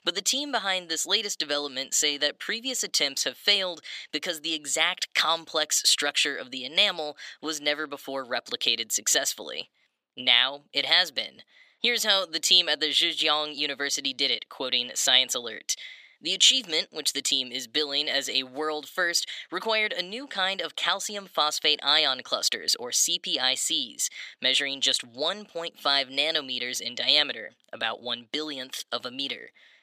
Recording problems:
thin; somewhat; fading below 550 Hz

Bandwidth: 14.5 kHz